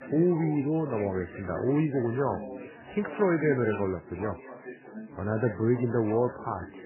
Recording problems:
garbled, watery; badly; nothing above 3 kHz
background chatter; noticeable; throughout; 4 voices, 15 dB below the speech

